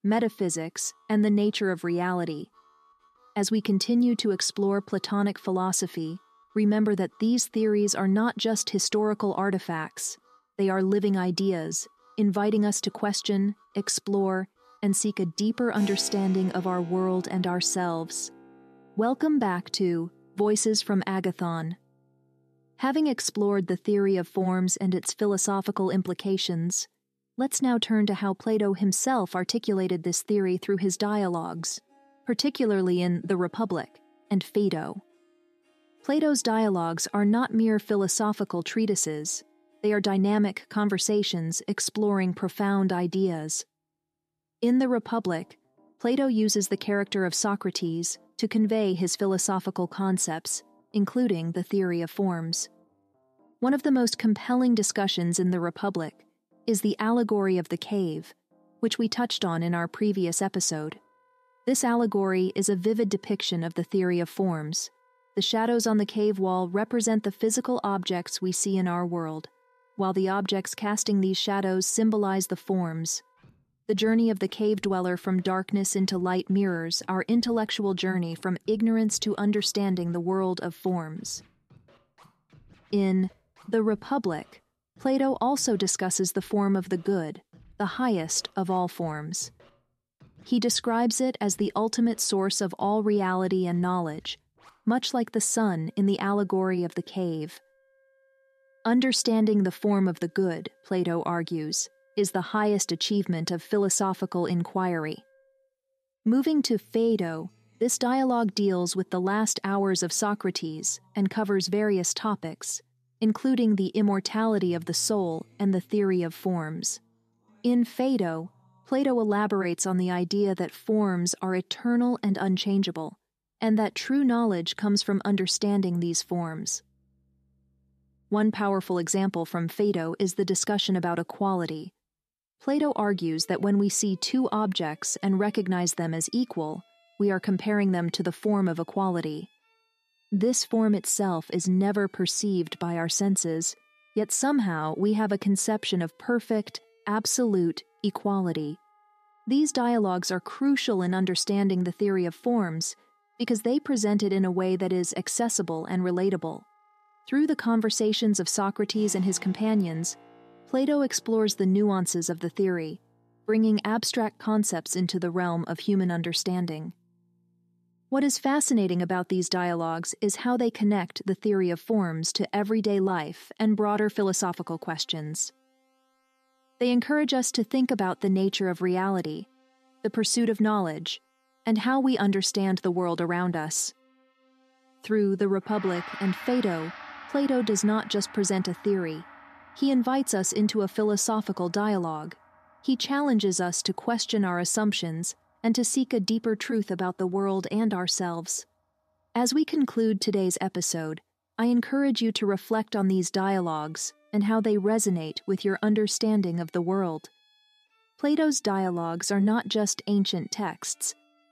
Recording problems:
background music; faint; throughout; 30 dB below the speech

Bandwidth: 14 kHz